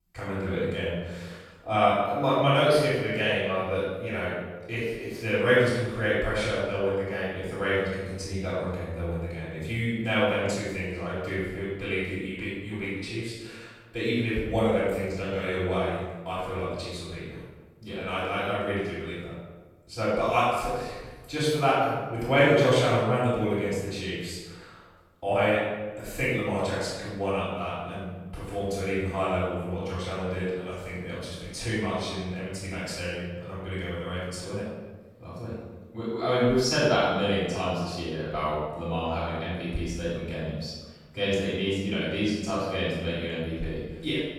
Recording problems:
room echo; strong; dies away in 1.1 s
off-mic speech; far

